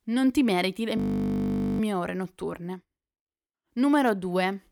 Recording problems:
audio freezing; at 1 s for 1 s

